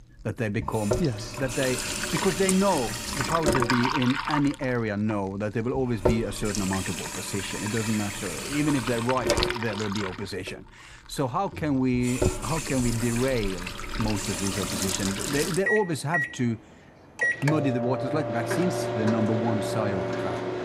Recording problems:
household noises; loud; throughout; 1 dB below the speech

